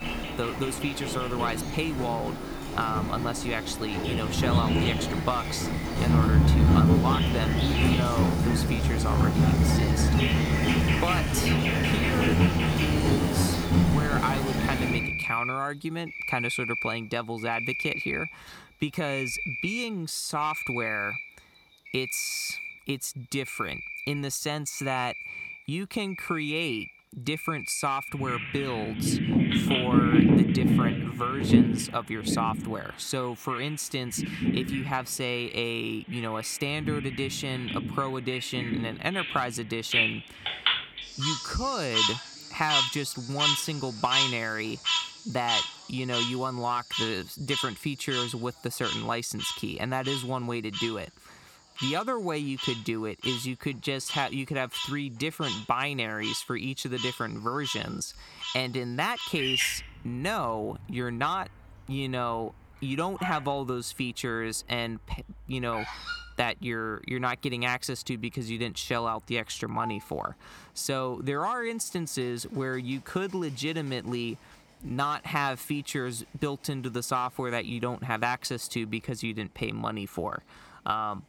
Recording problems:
animal sounds; very loud; throughout; 4 dB above the speech

